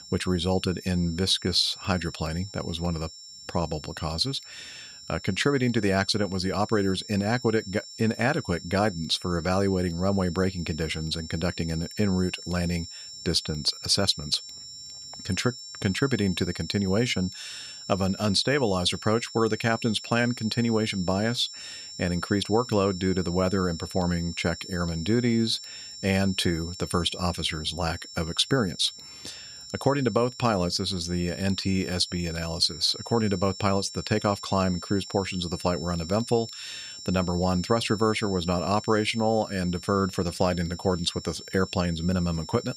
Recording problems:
high-pitched whine; noticeable; throughout; 5.5 kHz, 15 dB below the speech

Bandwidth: 14.5 kHz